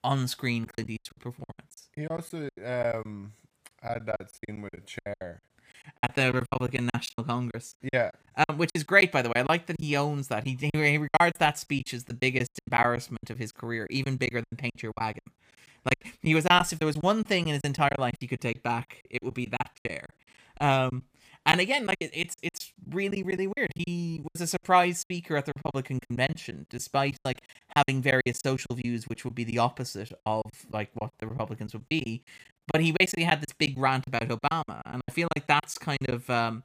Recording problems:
choppy; very; 17% of the speech affected

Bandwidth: 15 kHz